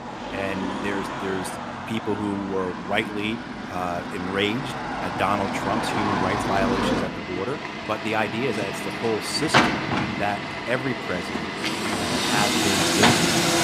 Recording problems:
traffic noise; very loud; throughout; 3 dB above the speech

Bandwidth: 15 kHz